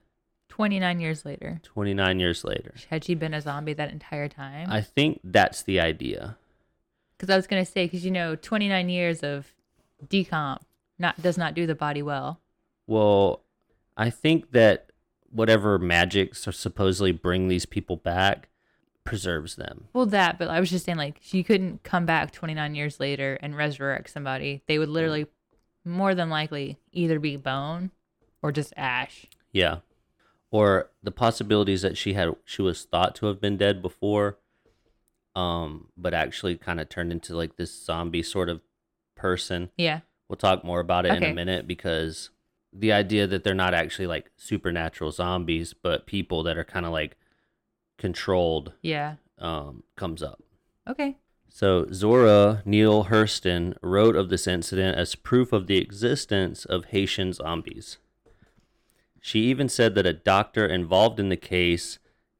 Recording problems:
none

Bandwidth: 17 kHz